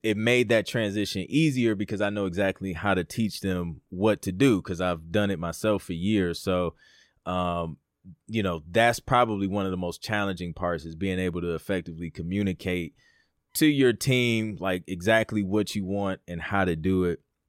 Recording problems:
none

